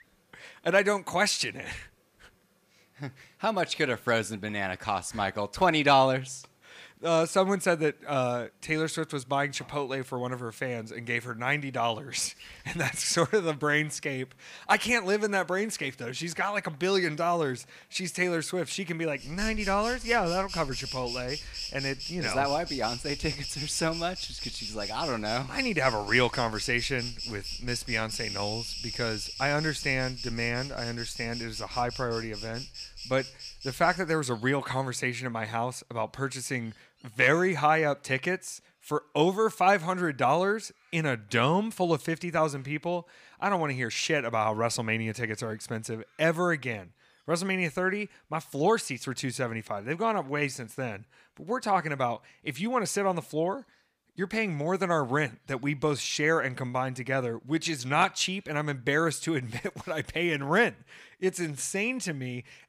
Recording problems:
animal sounds; loud; throughout; 8 dB below the speech

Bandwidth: 15 kHz